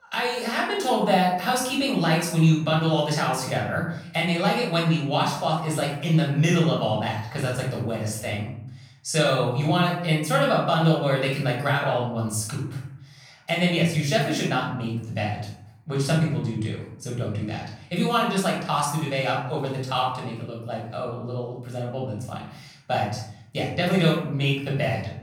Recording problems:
off-mic speech; far
room echo; noticeable; dies away in 0.8 s

